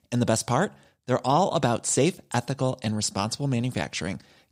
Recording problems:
none

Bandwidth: 15.5 kHz